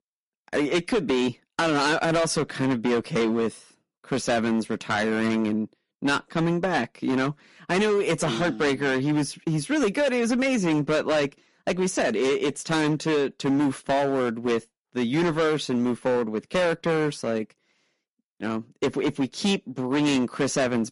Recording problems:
distortion; heavy; 13% of the sound clipped
garbled, watery; slightly; nothing above 11 kHz

